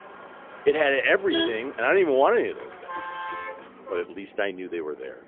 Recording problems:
phone-call audio; poor line; nothing above 3 kHz
traffic noise; noticeable; throughout; 10 dB below the speech

